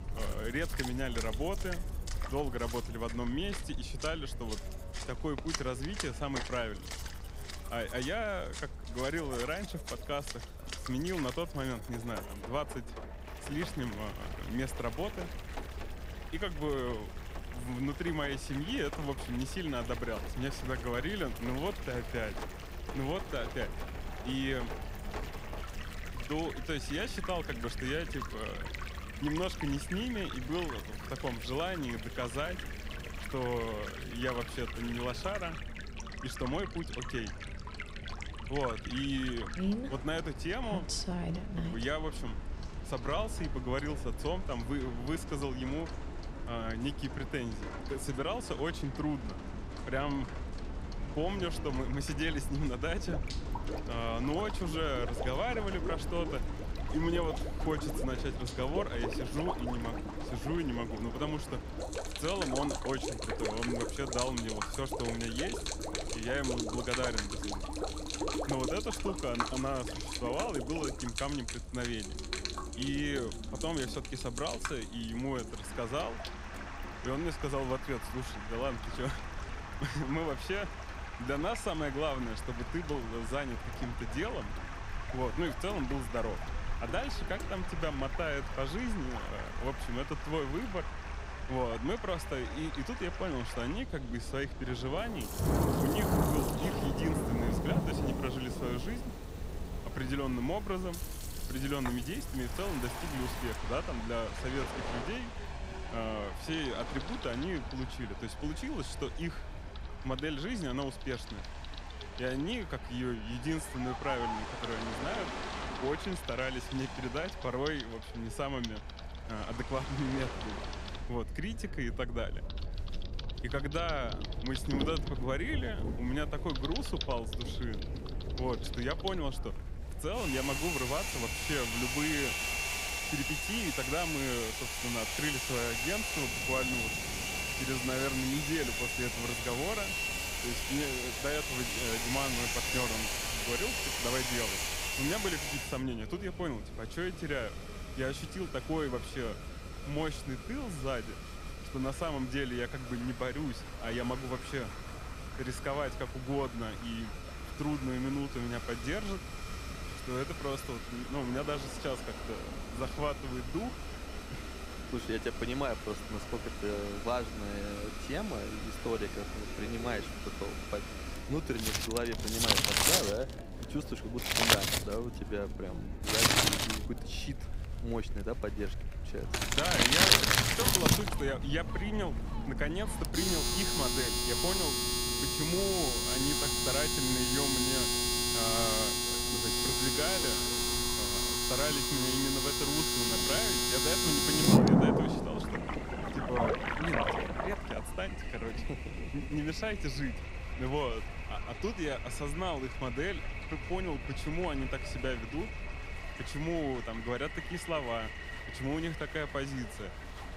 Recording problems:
household noises; very loud; throughout; 3 dB above the speech
rain or running water; loud; throughout; 5 dB below the speech
chatter from many people; noticeable; throughout; 15 dB below the speech
low rumble; faint; throughout; 20 dB below the speech

